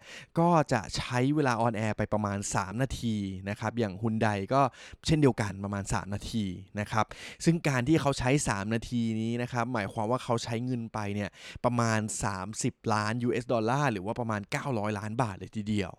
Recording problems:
none

